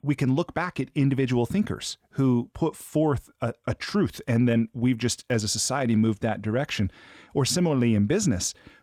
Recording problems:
none

